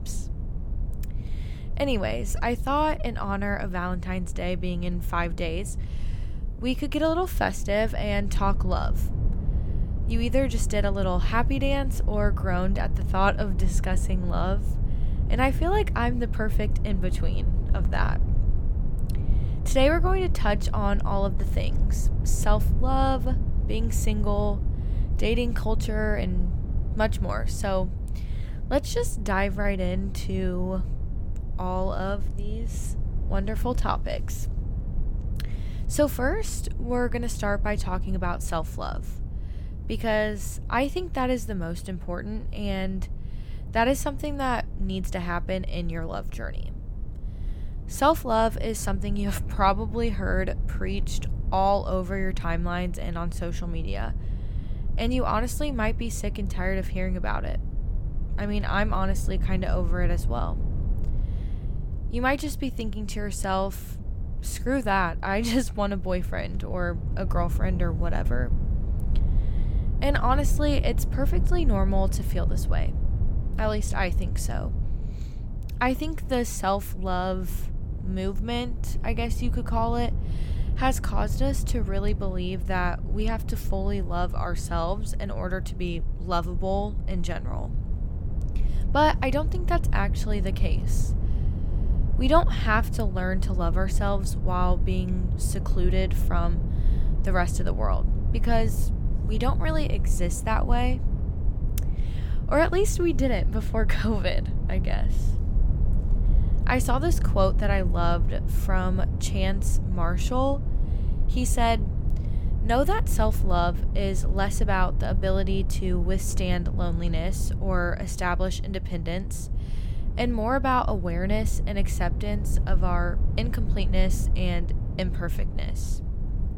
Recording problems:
low rumble; noticeable; throughout; 15 dB below the speech

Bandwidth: 17 kHz